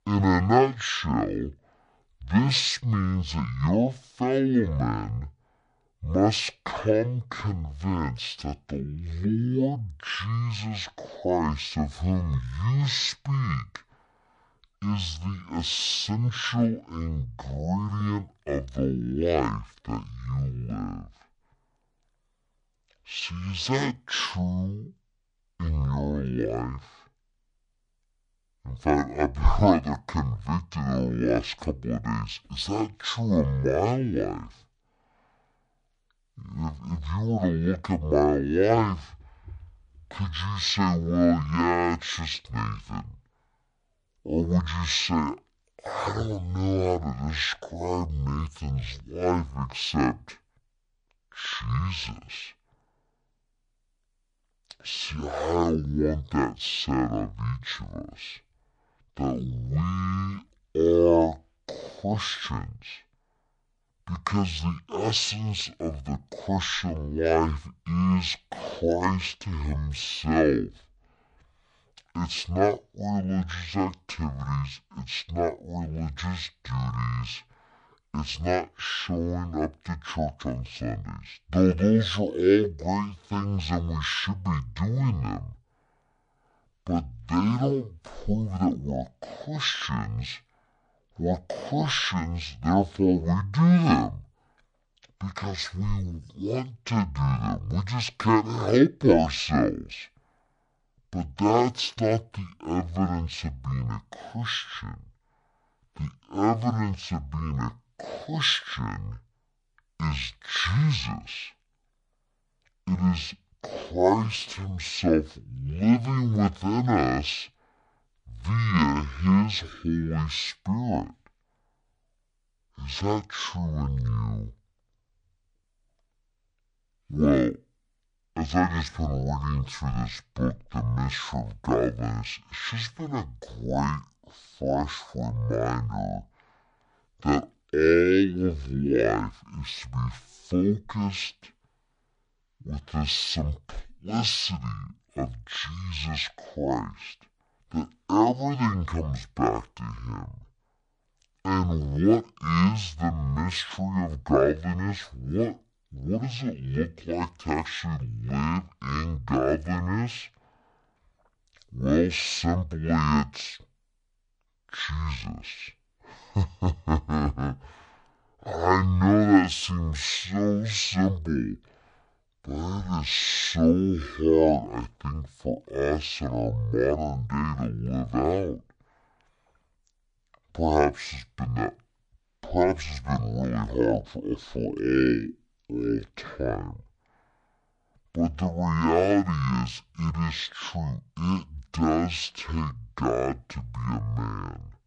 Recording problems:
wrong speed and pitch; too slow and too low; 0.5 times normal speed

